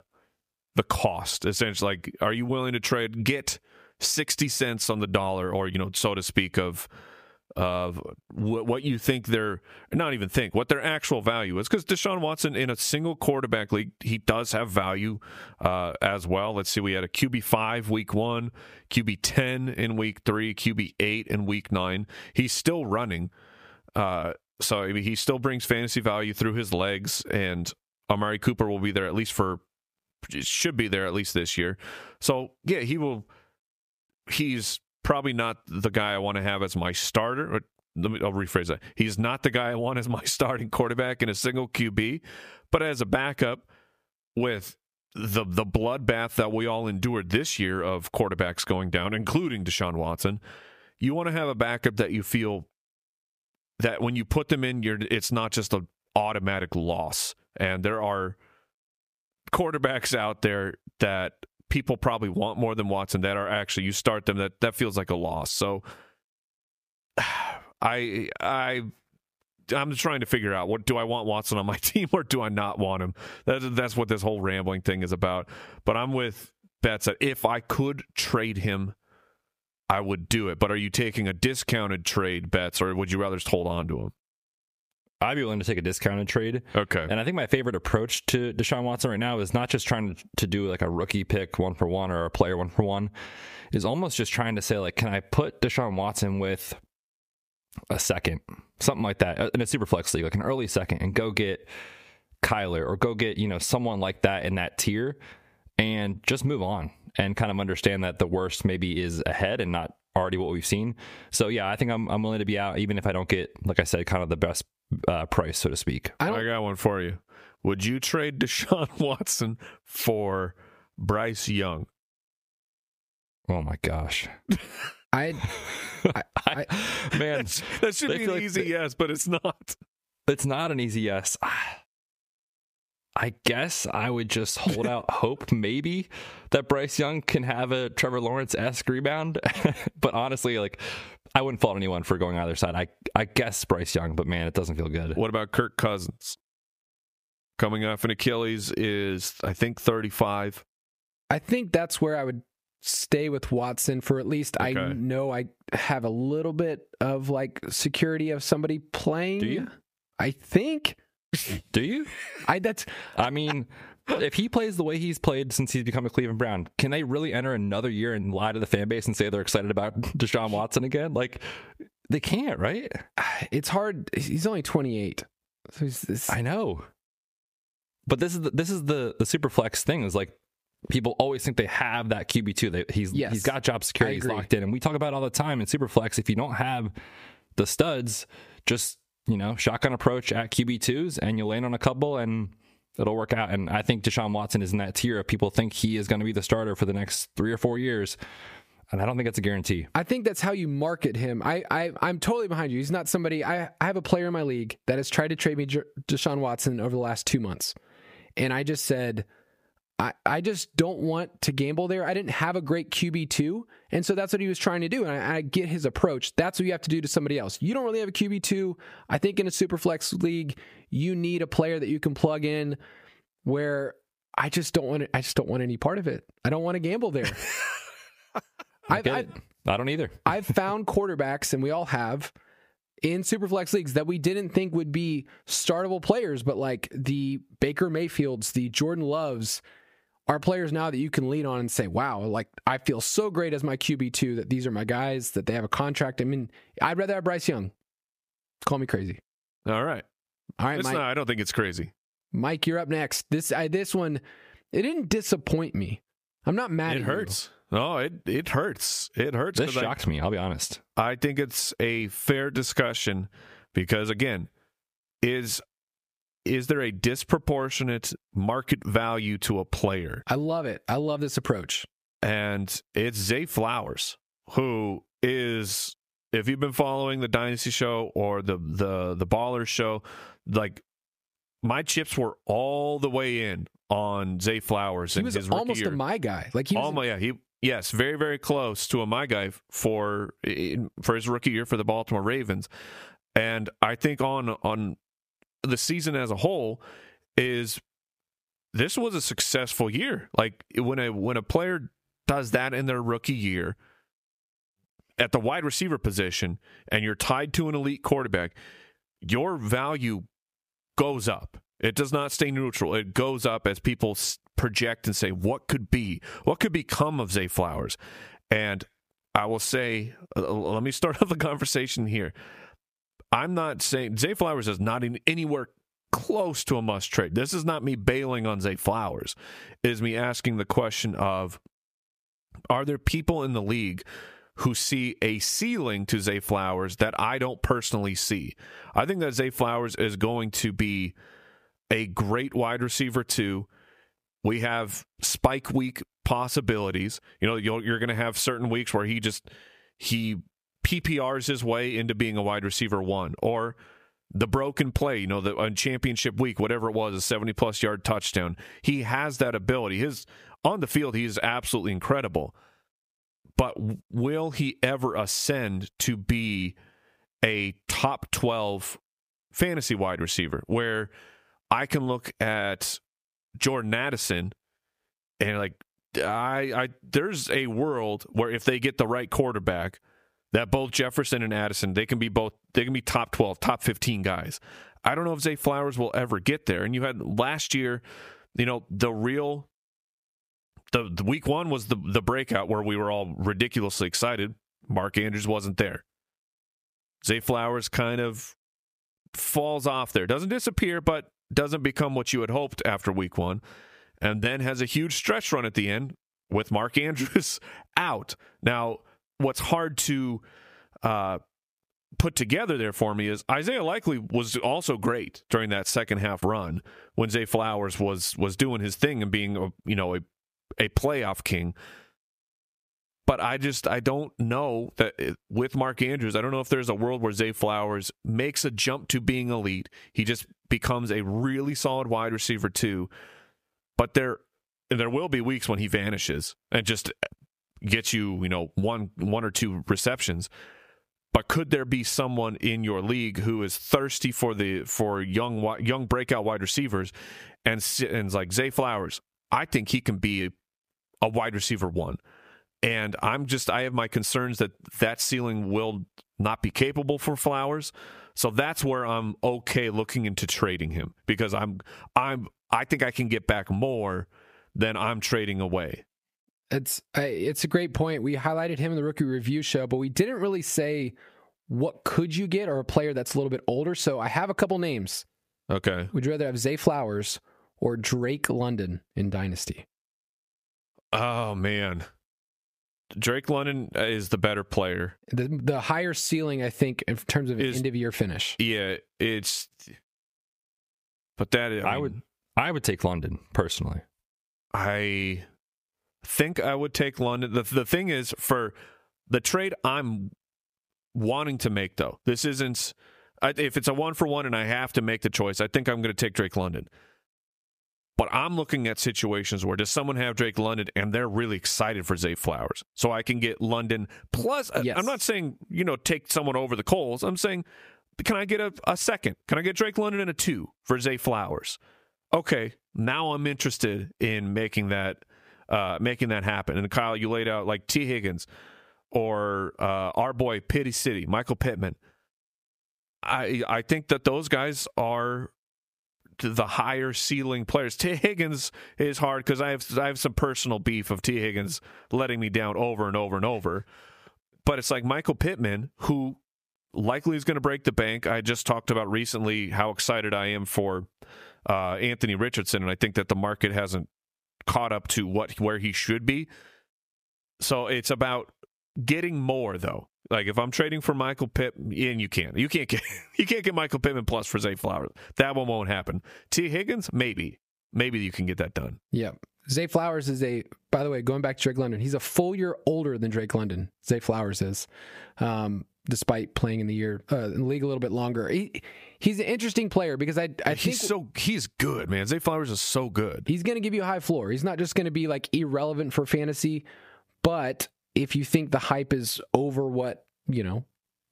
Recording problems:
squashed, flat; heavily

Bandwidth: 15 kHz